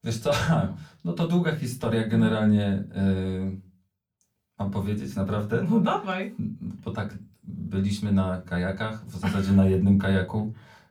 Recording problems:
off-mic speech; far
room echo; very slight; dies away in 0.3 s

